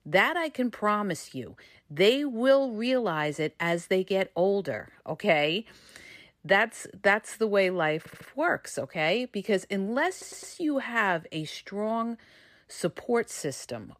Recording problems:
audio stuttering; at 8 s and at 10 s

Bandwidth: 14.5 kHz